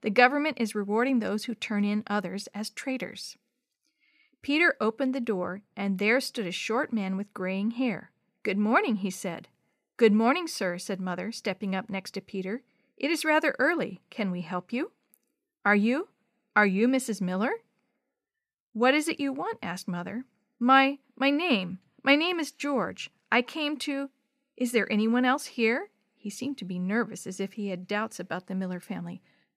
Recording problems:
none

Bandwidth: 14.5 kHz